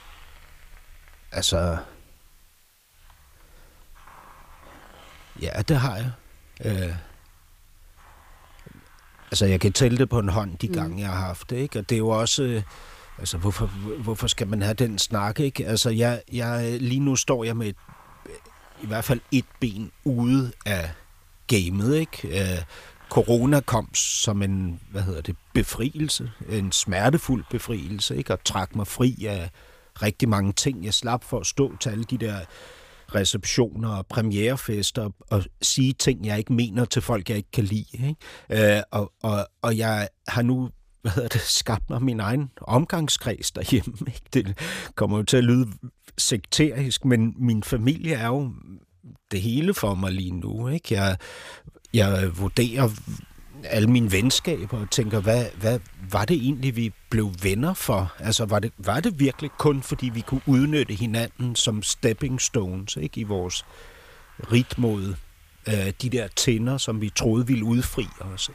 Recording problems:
hiss; faint; until 33 s and from 52 s on; 30 dB below the speech

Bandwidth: 15 kHz